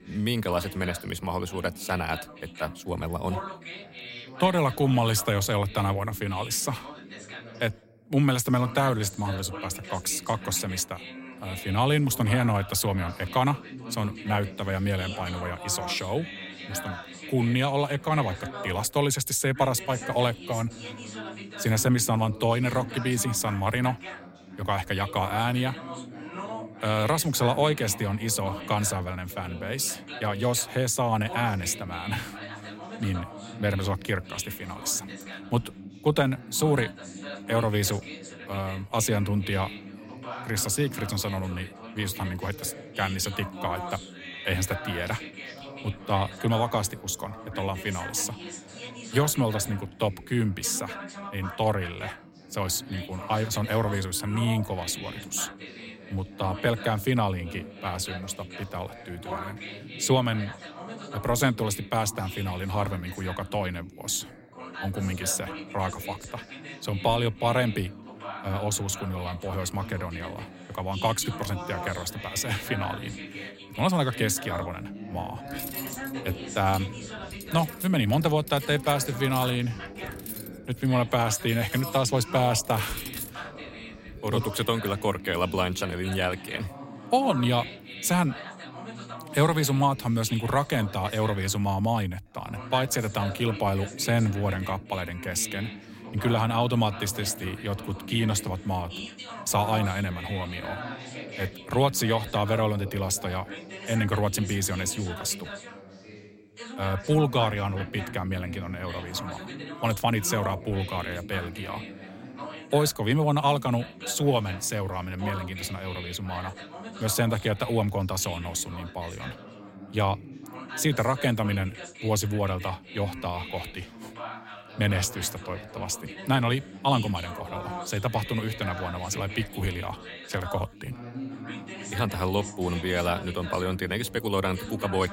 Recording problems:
background chatter; noticeable; throughout; 2 voices, 10 dB below the speech
clattering dishes; noticeable; from 1:15 to 1:24; peak 7 dB below the speech

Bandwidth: 16 kHz